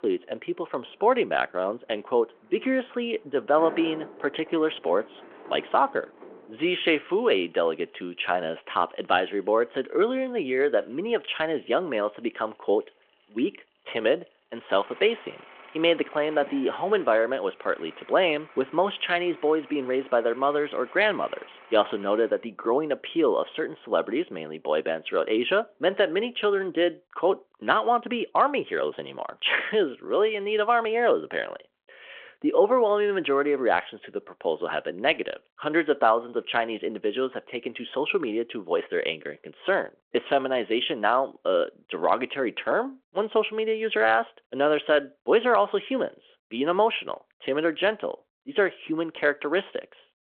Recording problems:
phone-call audio
traffic noise; faint; until 27 s; 20 dB below the speech

